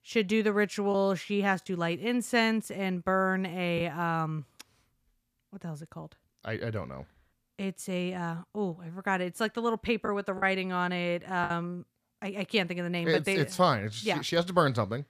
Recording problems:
choppy; occasionally; 1% of the speech affected

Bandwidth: 14.5 kHz